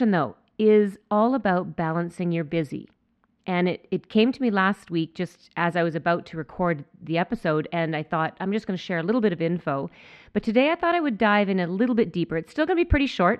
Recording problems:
muffled; very; fading above 2 kHz
abrupt cut into speech; at the start

